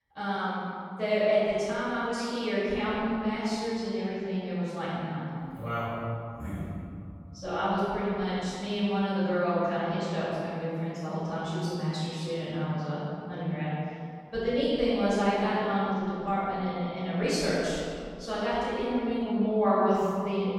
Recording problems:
room echo; strong; dies away in 2.3 s
off-mic speech; far

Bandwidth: 17 kHz